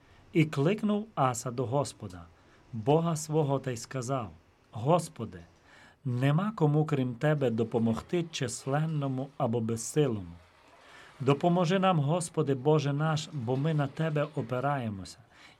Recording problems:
rain or running water; faint; throughout; 30 dB below the speech

